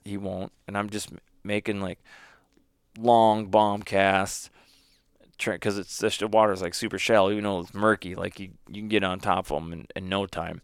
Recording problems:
none

